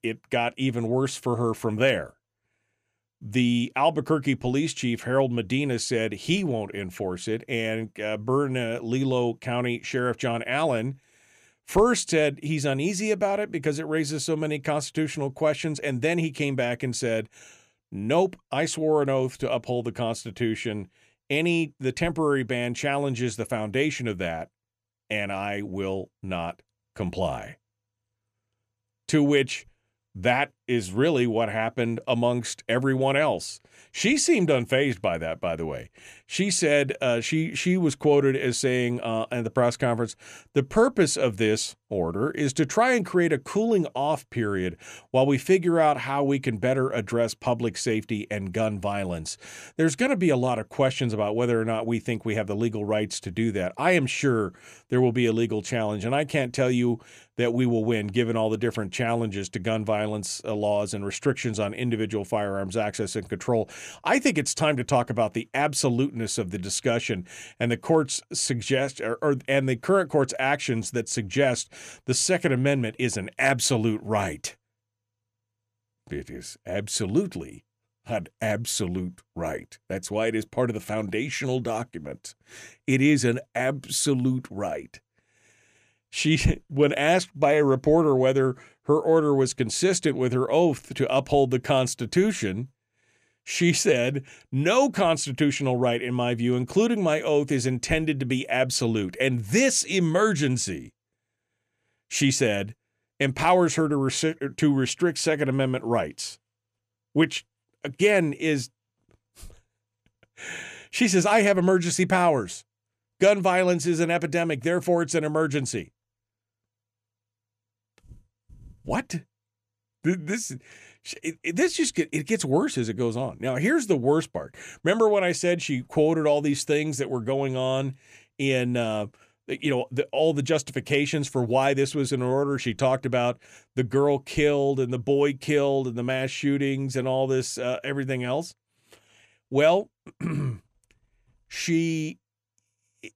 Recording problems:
none

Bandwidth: 14.5 kHz